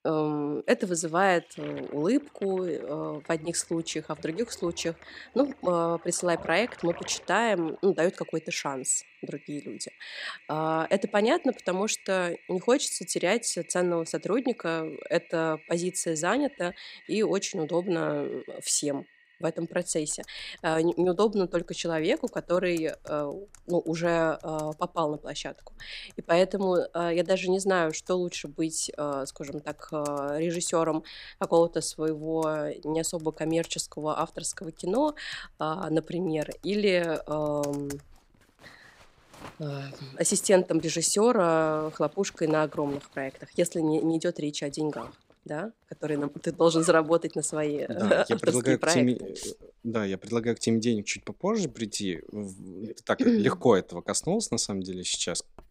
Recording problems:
household noises; faint; throughout; 25 dB below the speech

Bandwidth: 15.5 kHz